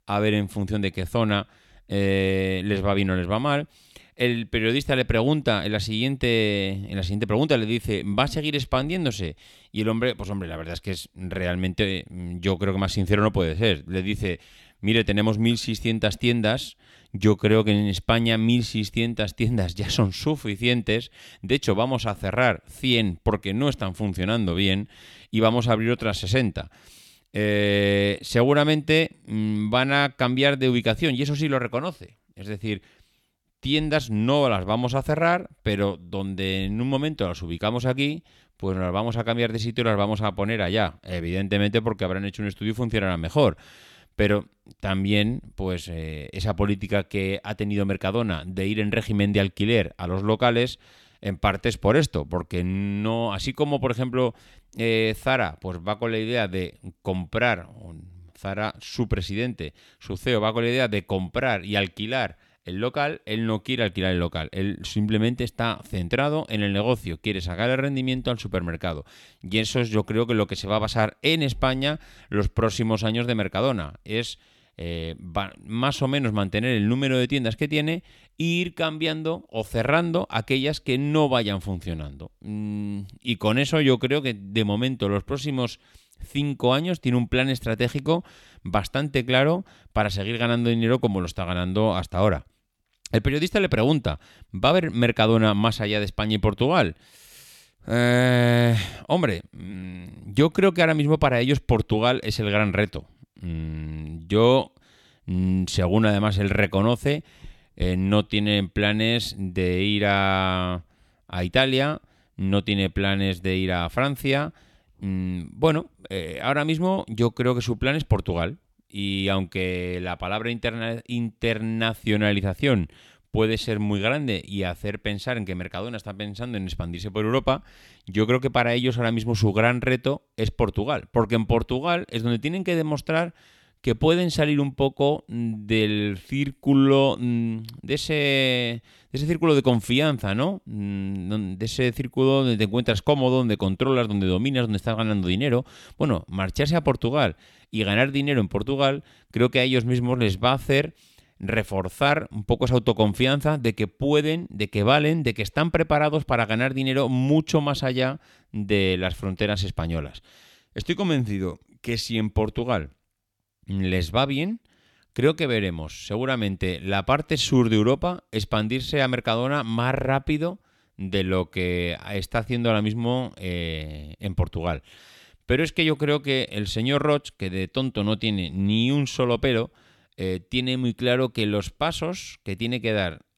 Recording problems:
none

